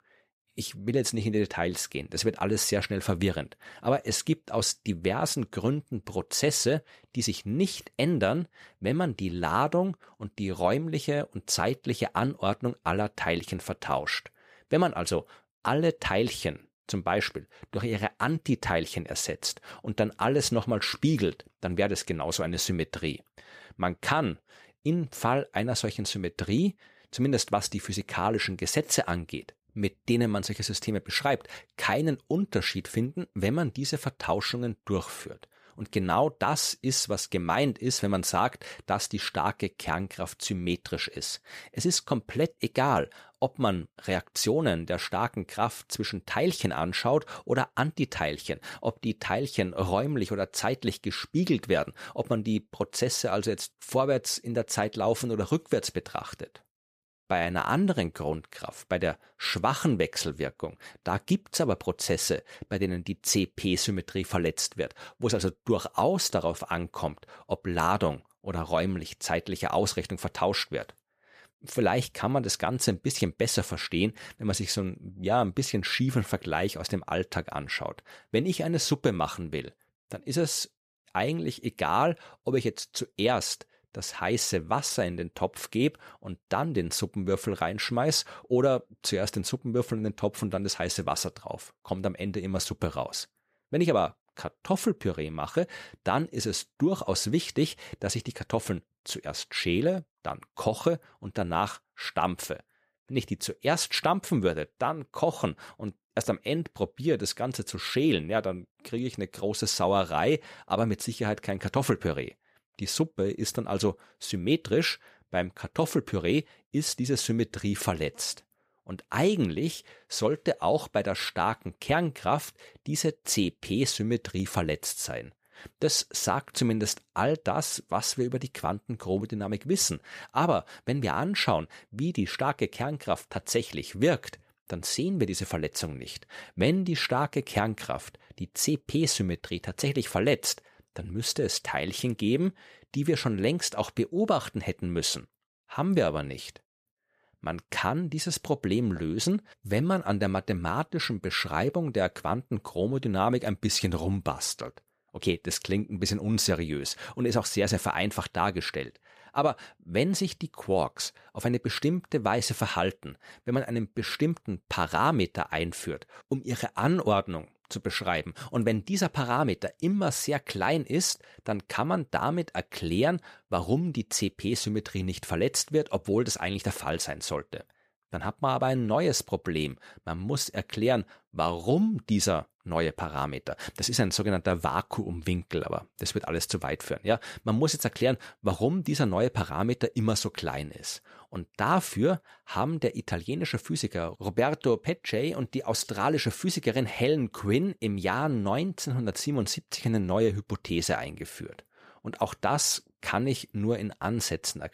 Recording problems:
none

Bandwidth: 14.5 kHz